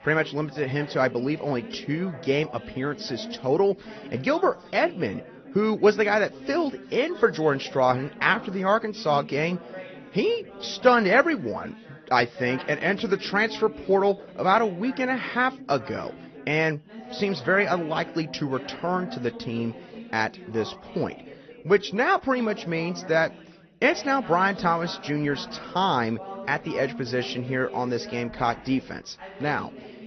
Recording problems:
garbled, watery; slightly; nothing above 6 kHz
background chatter; noticeable; throughout; 3 voices, 15 dB below the speech

